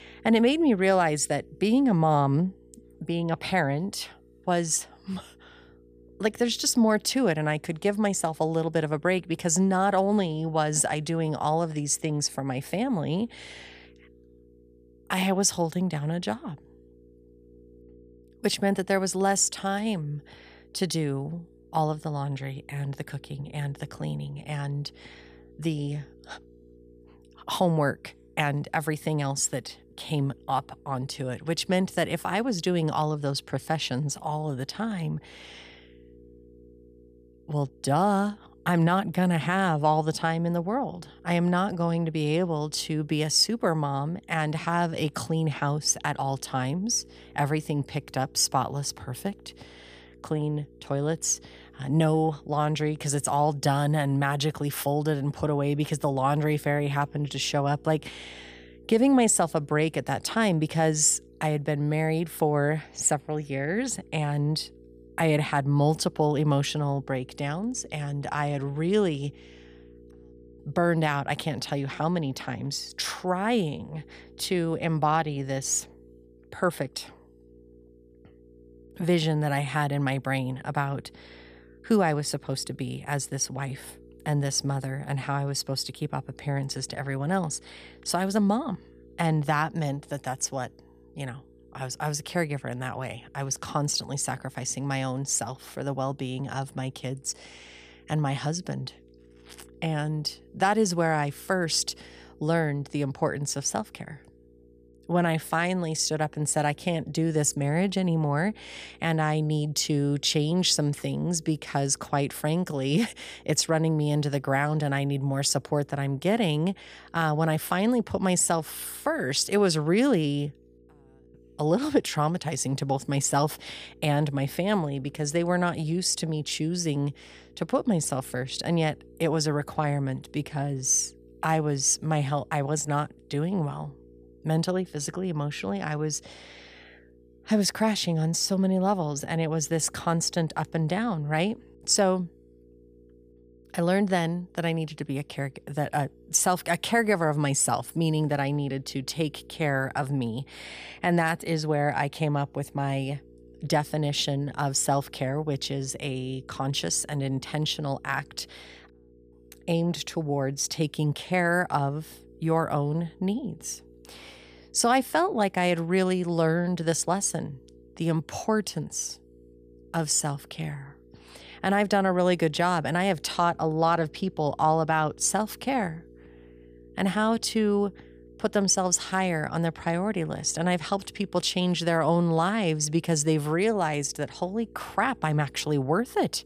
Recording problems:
electrical hum; faint; throughout; 60 Hz, 30 dB below the speech

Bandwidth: 15 kHz